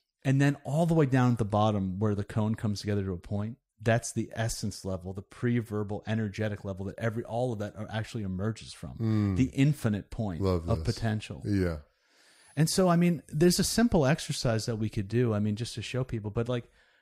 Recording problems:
none

